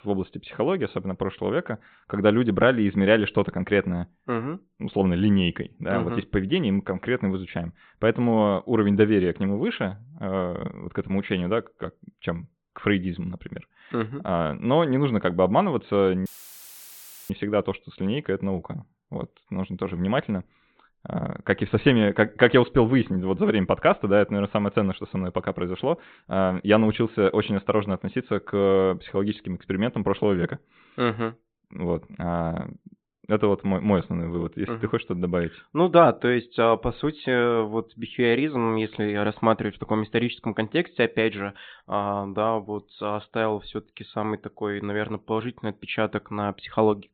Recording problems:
high frequencies cut off; severe; nothing above 4 kHz
audio cutting out; filled with static; at 16 s for 1 s

